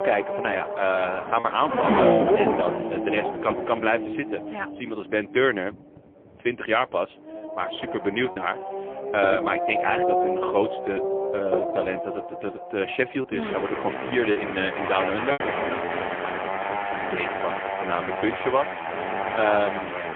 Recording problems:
phone-call audio; poor line; nothing above 3.5 kHz
traffic noise; loud; throughout; 1 dB below the speech
choppy; occasionally; 2% of the speech affected

